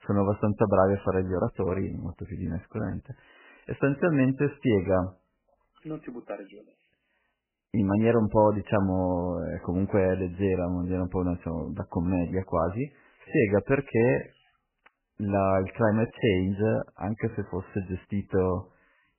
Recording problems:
garbled, watery; badly; nothing above 3 kHz

